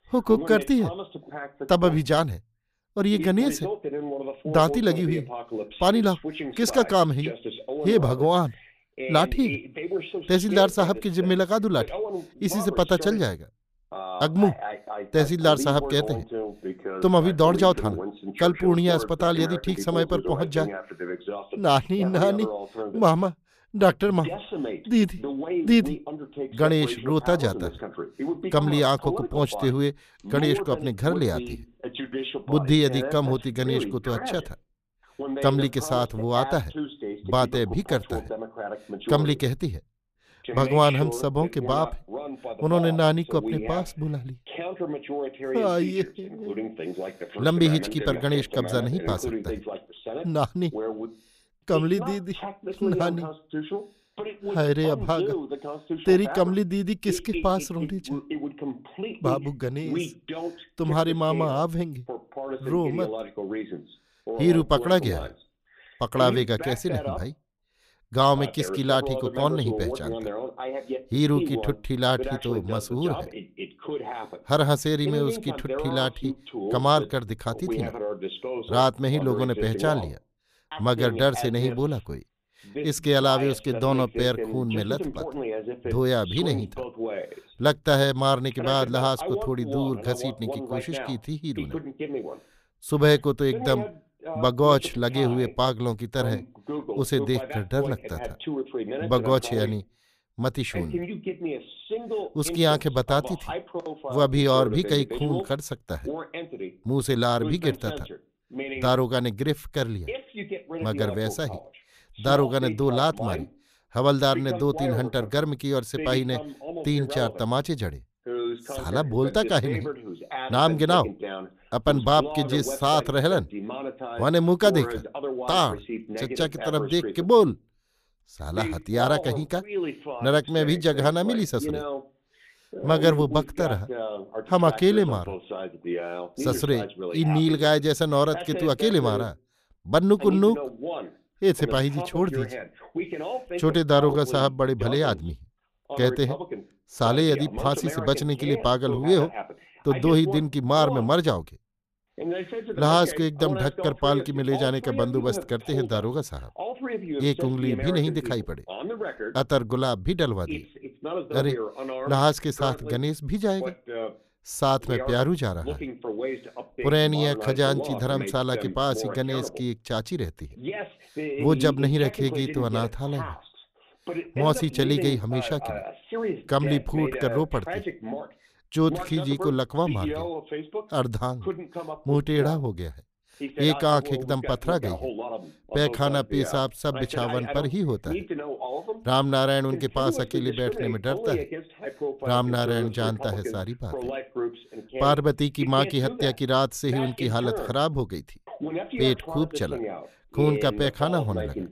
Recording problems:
voice in the background; loud; throughout; 9 dB below the speech

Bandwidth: 14.5 kHz